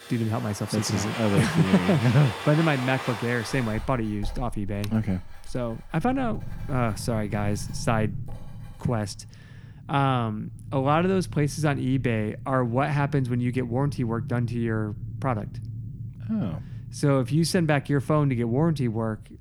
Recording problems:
household noises; noticeable; until 9 s; 10 dB below the speech
low rumble; faint; from 6 s on; 20 dB below the speech

